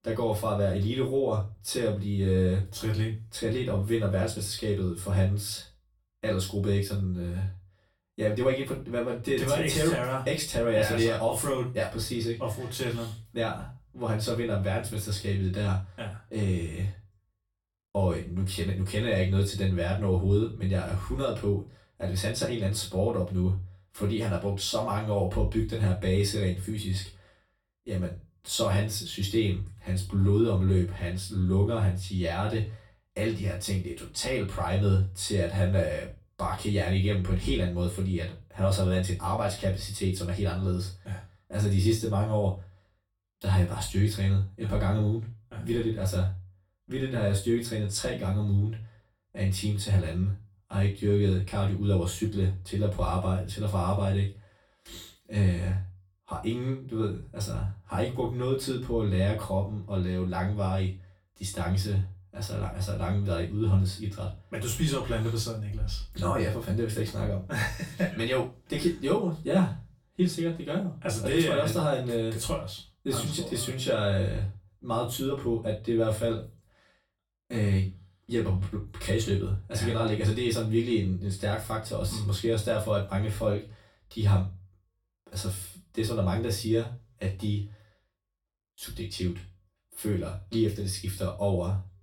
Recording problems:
off-mic speech; far
room echo; slight; dies away in 0.3 s

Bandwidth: 17 kHz